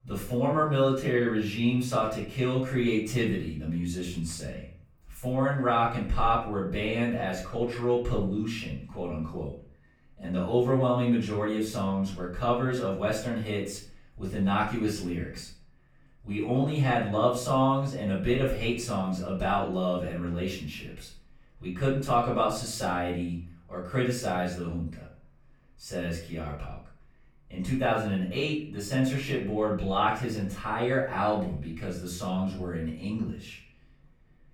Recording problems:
off-mic speech; far
room echo; noticeable; dies away in 0.4 s

